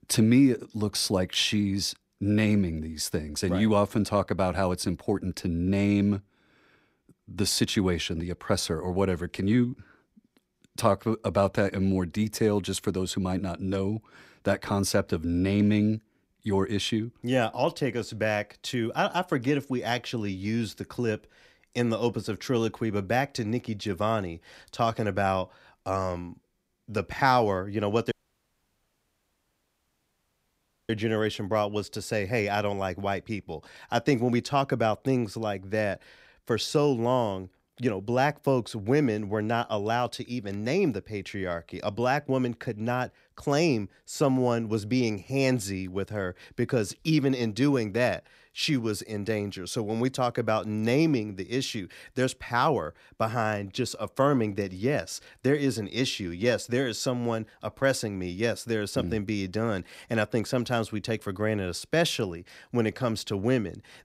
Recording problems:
audio cutting out; at 28 s for 3 s

